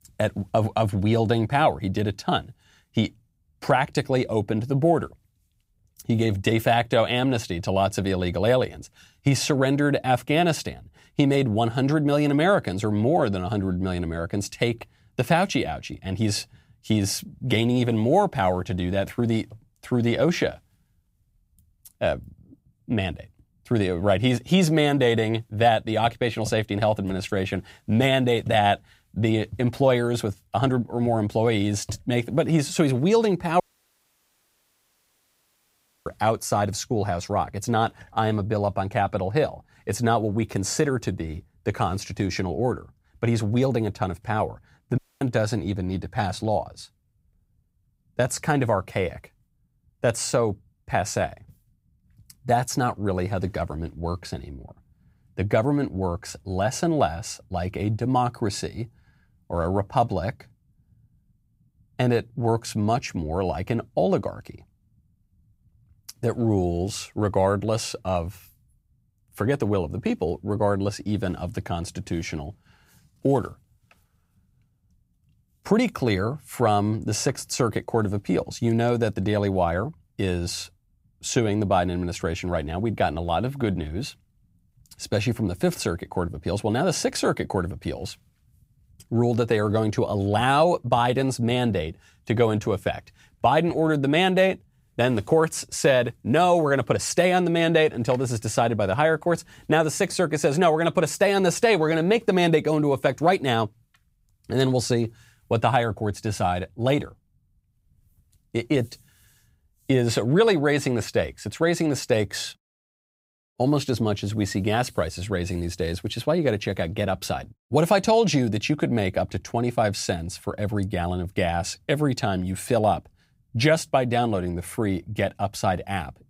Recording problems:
audio cutting out; at 34 s for 2.5 s and at 45 s

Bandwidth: 15.5 kHz